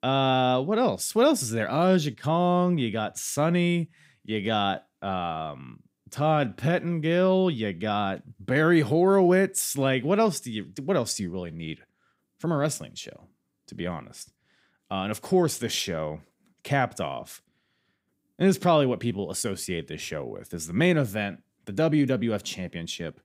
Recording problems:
none

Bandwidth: 15.5 kHz